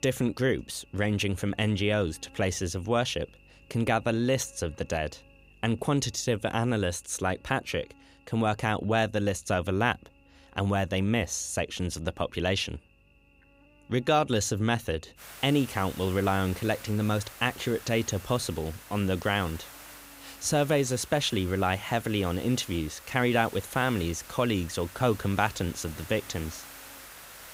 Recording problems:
hiss; noticeable; from 15 s on; 15 dB below the speech
electrical hum; faint; throughout; 50 Hz, 30 dB below the speech

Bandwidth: 15.5 kHz